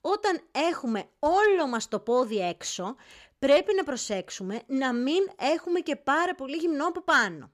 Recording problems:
none

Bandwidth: 15 kHz